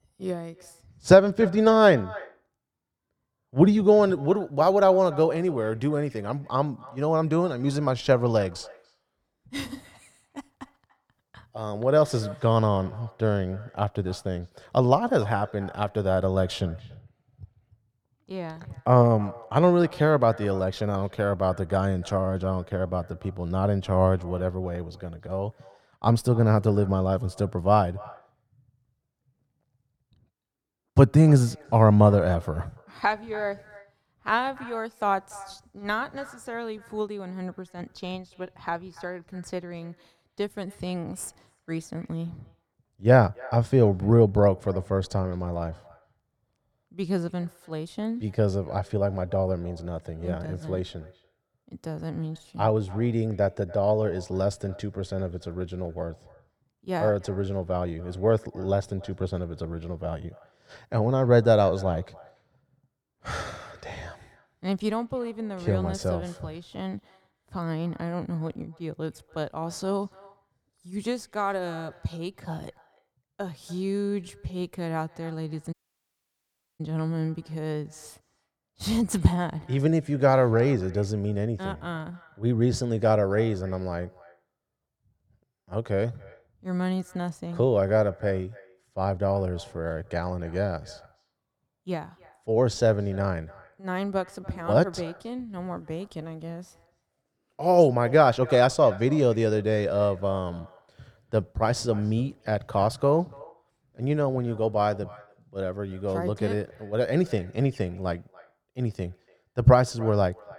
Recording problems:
muffled; slightly; fading above 2 kHz
echo of what is said; faint; throughout; 290 ms later, 25 dB below the speech
audio cutting out; at 1:16 for 1 s

